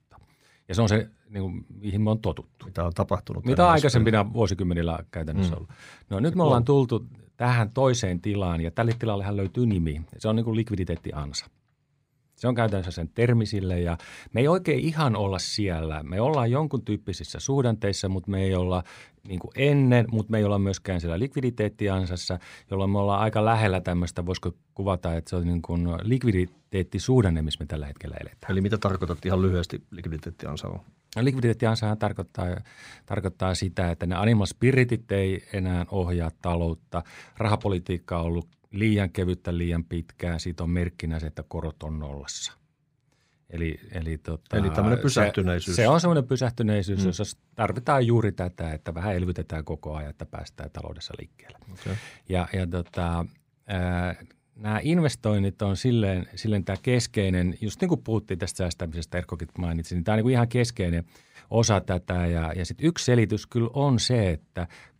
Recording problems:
none

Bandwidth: 15.5 kHz